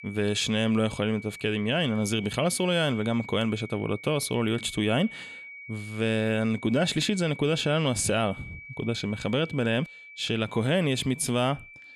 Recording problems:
high-pitched whine; noticeable; throughout; 2.5 kHz, 15 dB below the speech

